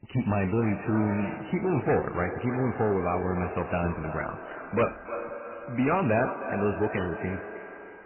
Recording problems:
echo of what is said; strong; throughout; 310 ms later, 9 dB below the speech
garbled, watery; badly; nothing above 2.5 kHz
distortion; slight; 4% of the sound clipped
household noises; noticeable; throughout; 15 dB below the speech

